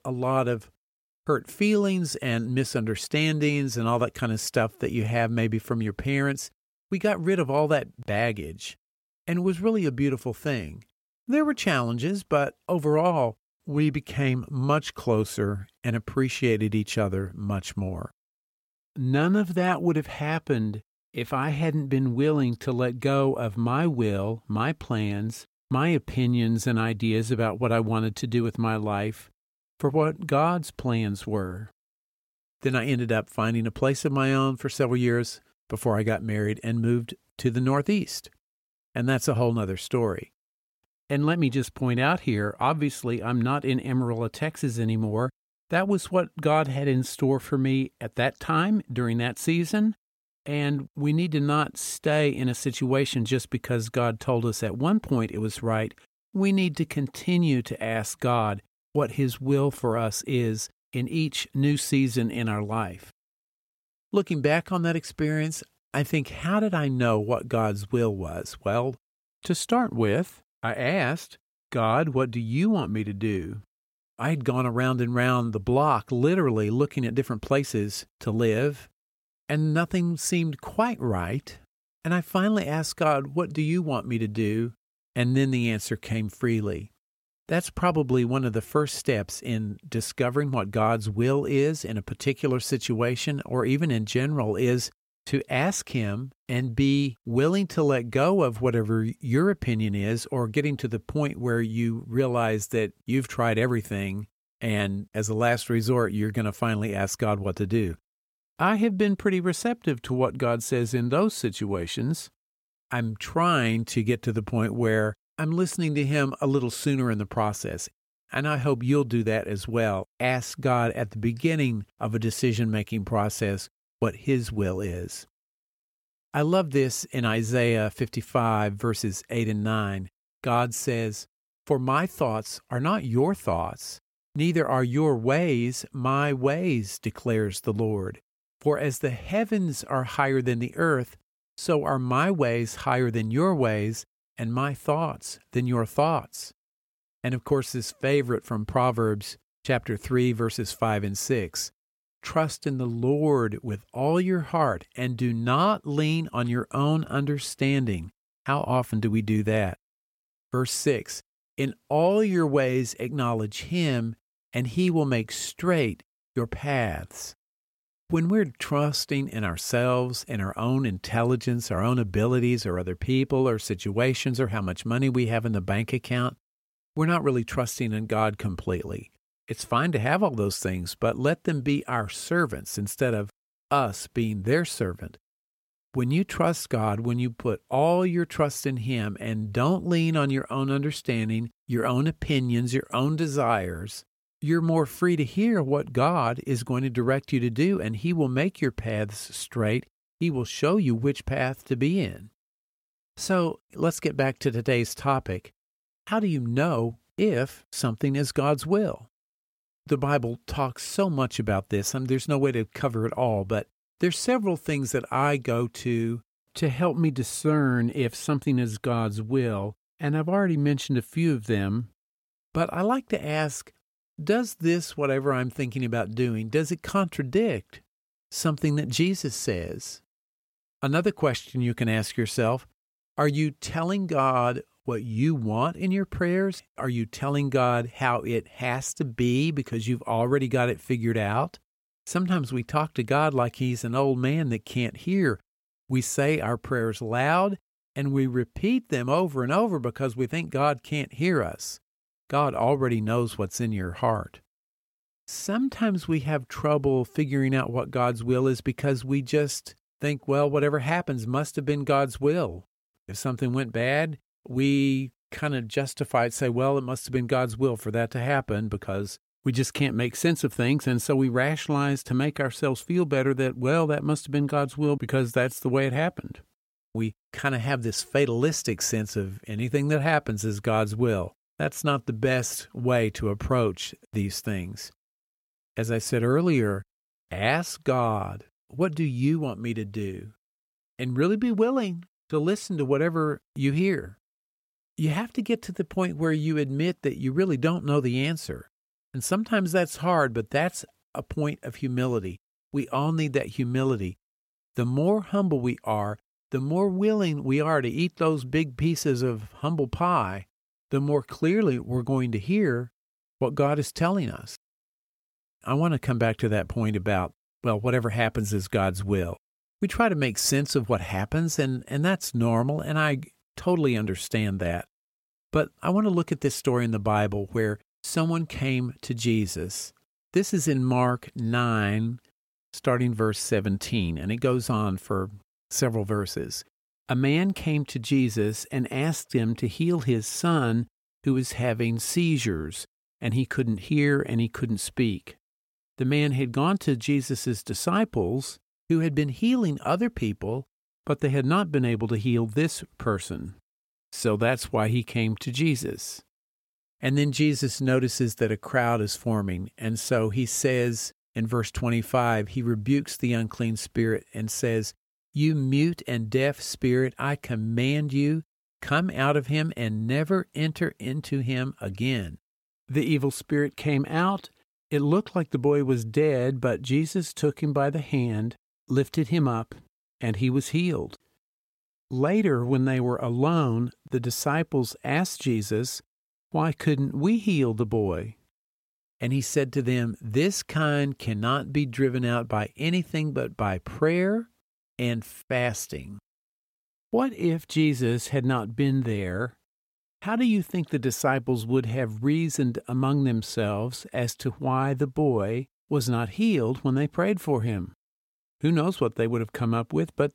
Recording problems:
none

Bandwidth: 16.5 kHz